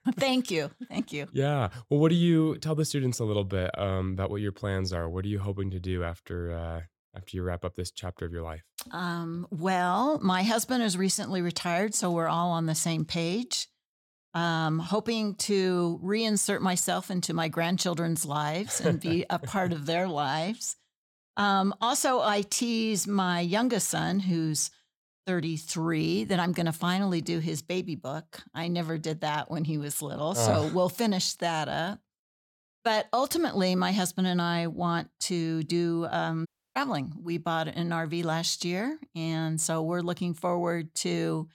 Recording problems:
audio cutting out; at 36 s

